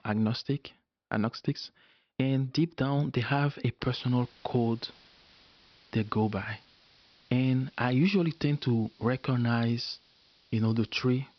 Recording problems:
high frequencies cut off; noticeable; nothing above 5.5 kHz
hiss; faint; from 4 s on; 30 dB below the speech

